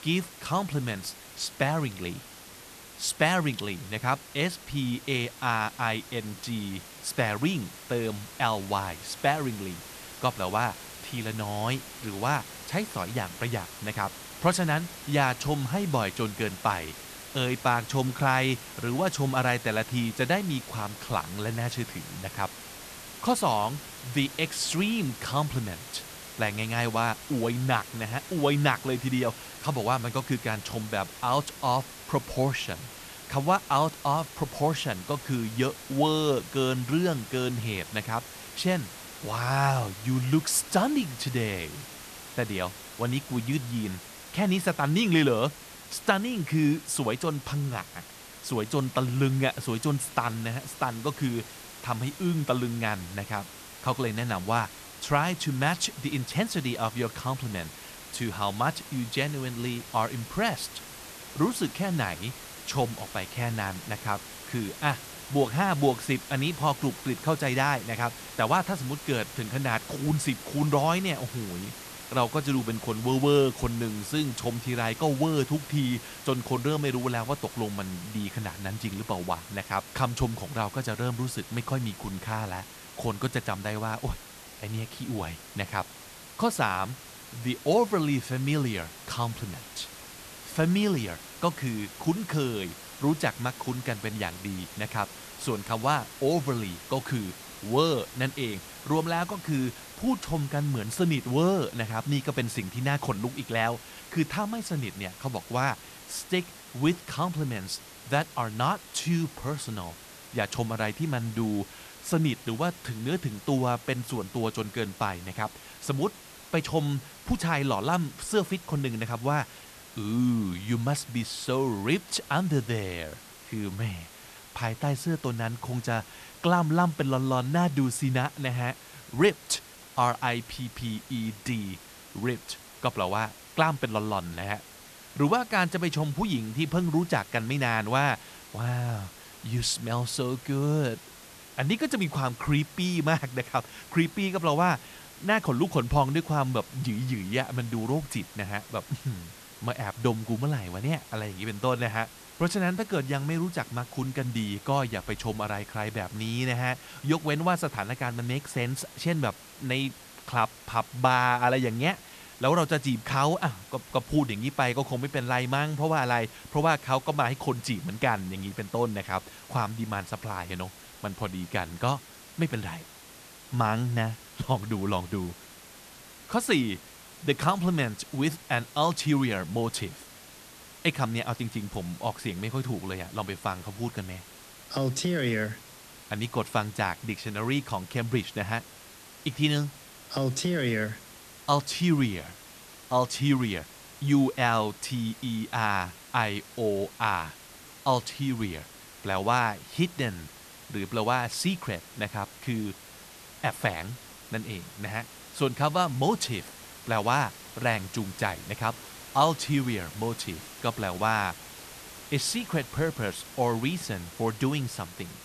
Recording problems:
hiss; noticeable; throughout; 15 dB below the speech

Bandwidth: 14 kHz